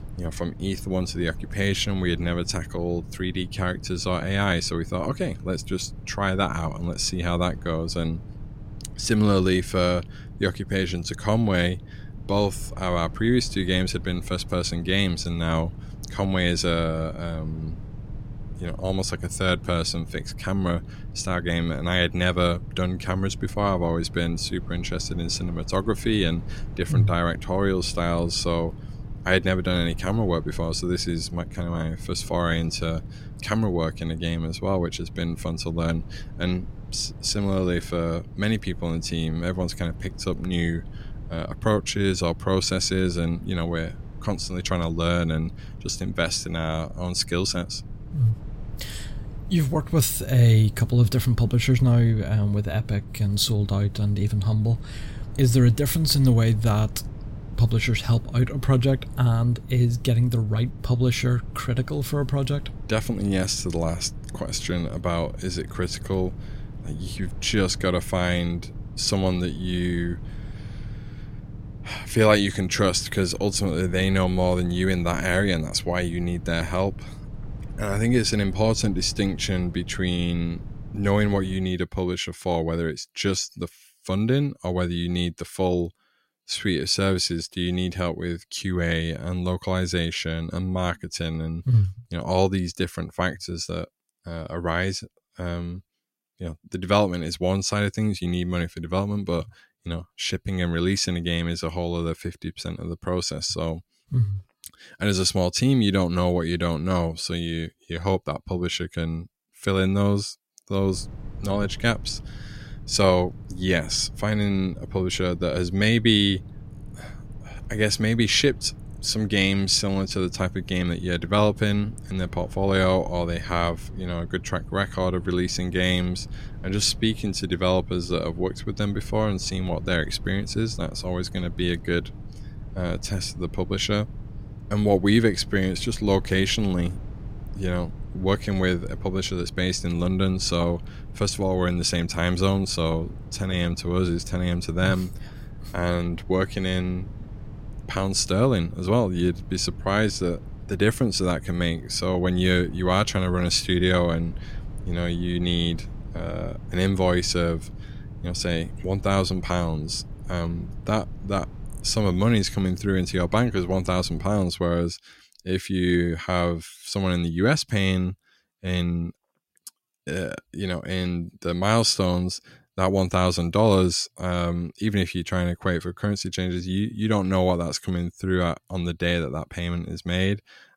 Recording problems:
low rumble; faint; until 1:22 and from 1:51 to 2:44; 20 dB below the speech

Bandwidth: 16 kHz